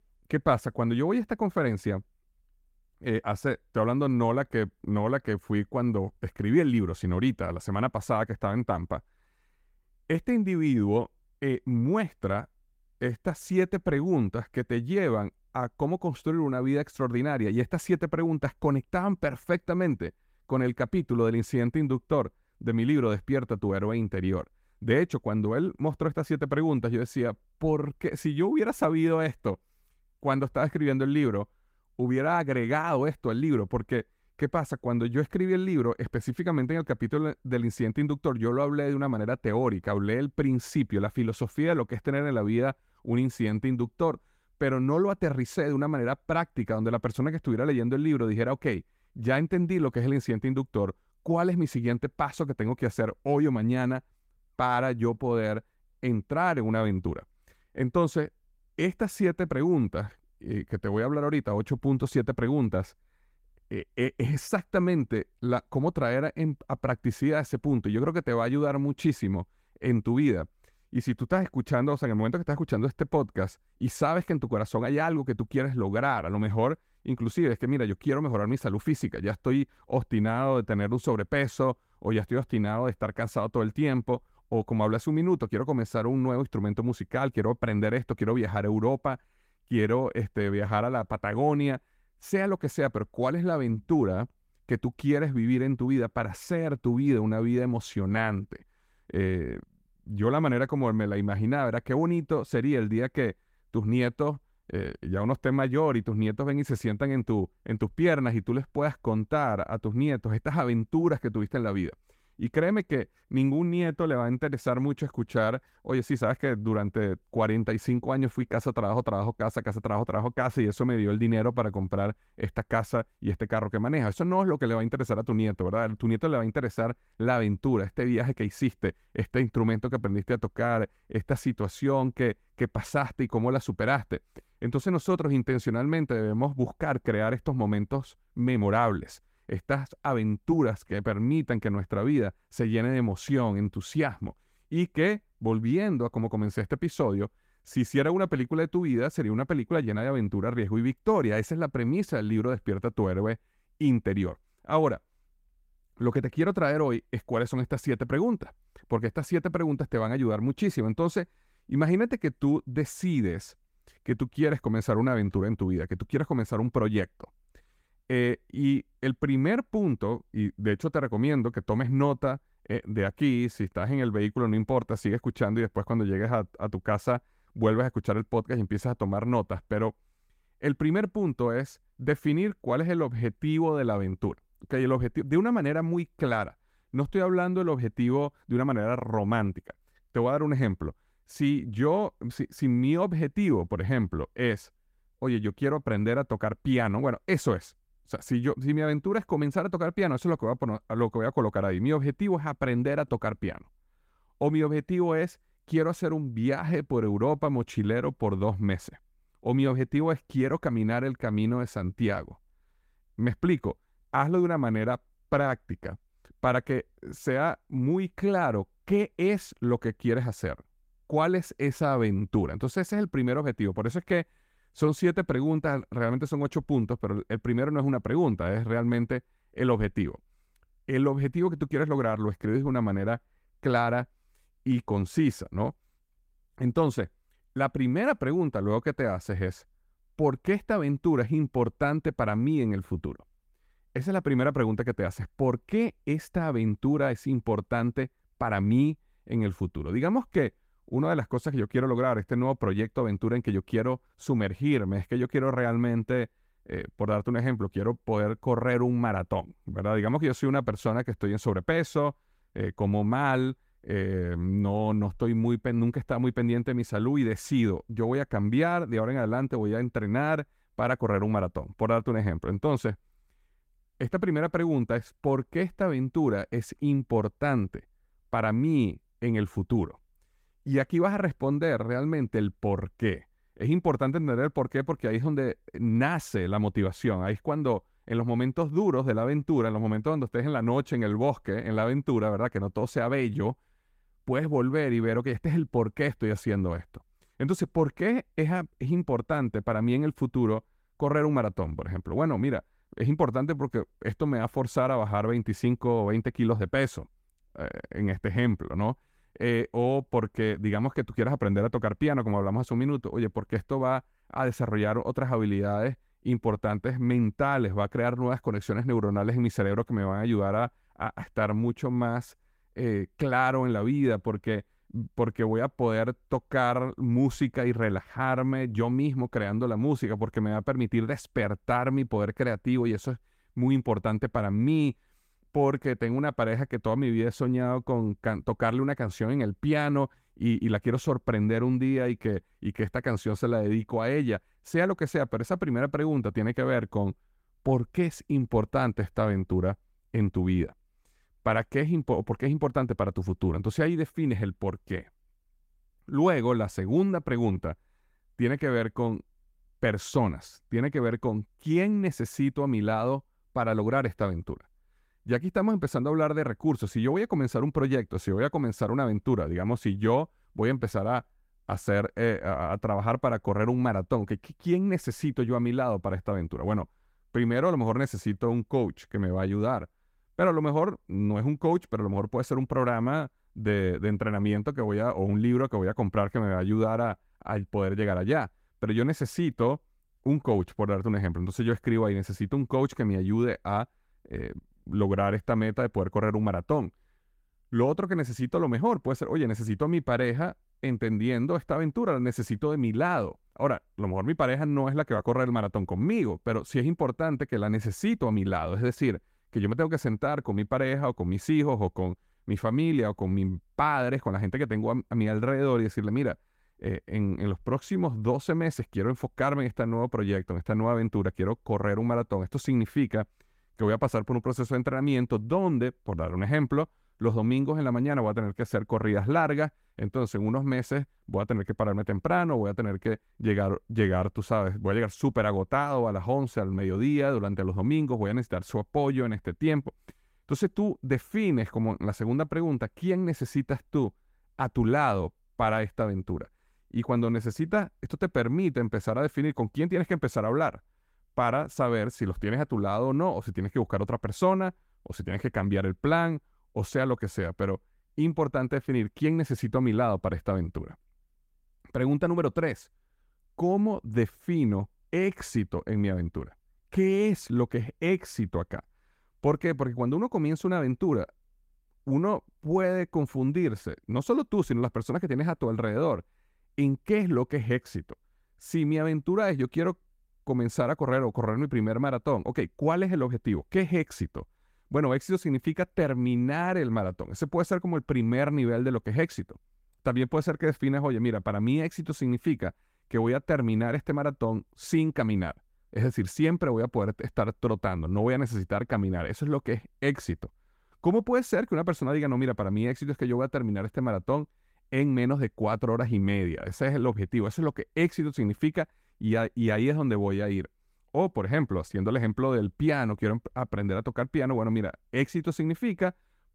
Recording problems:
garbled, watery; slightly; nothing above 16 kHz

